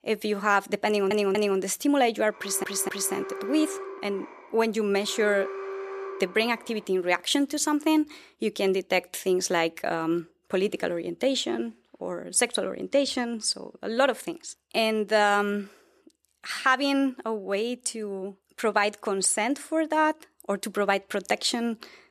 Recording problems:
audio stuttering; at 1 s and at 2.5 s
alarm; noticeable; from 2.5 to 7 s; peak 8 dB below the speech

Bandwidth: 14 kHz